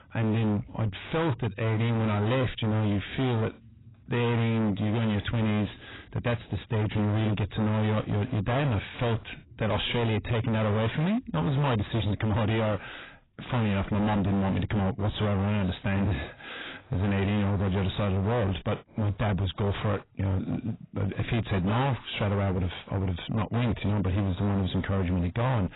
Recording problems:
distortion; heavy; 31% of the sound clipped
garbled, watery; badly; nothing above 4 kHz

